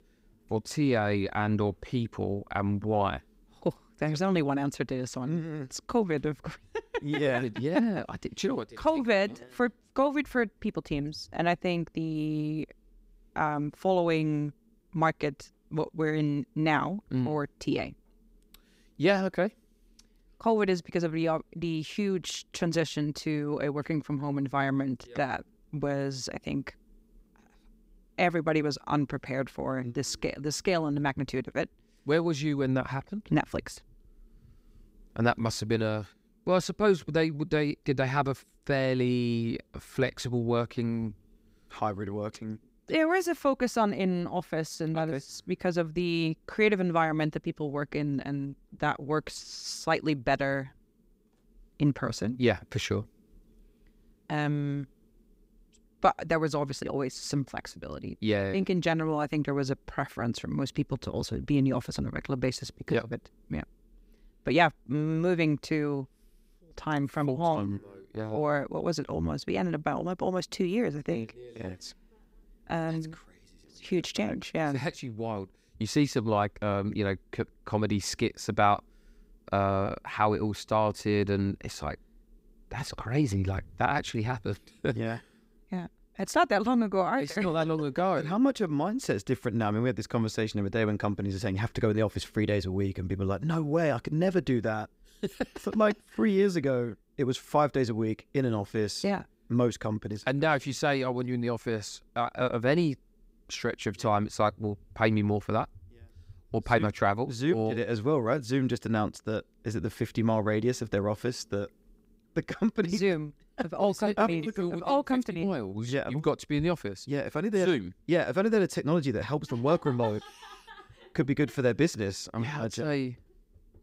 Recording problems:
none

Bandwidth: 15.5 kHz